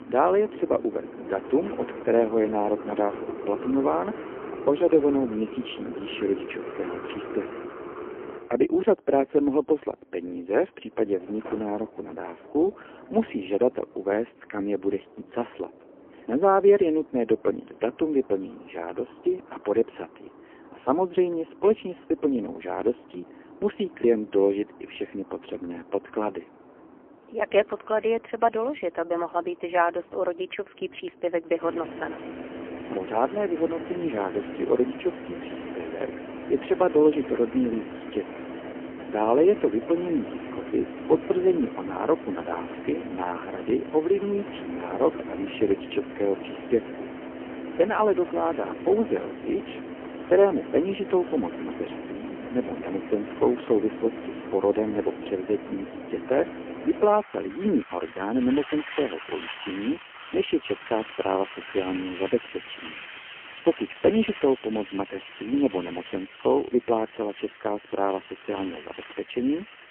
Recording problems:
phone-call audio; poor line; nothing above 3 kHz
traffic noise; noticeable; throughout; 10 dB below the speech

